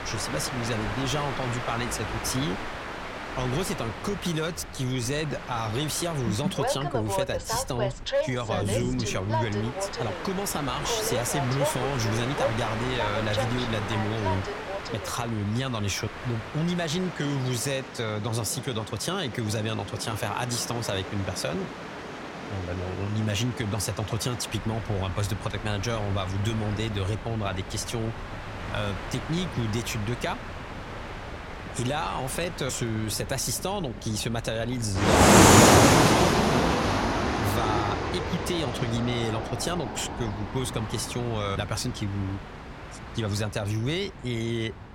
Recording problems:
train or aircraft noise; very loud; throughout; 2 dB above the speech

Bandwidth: 16.5 kHz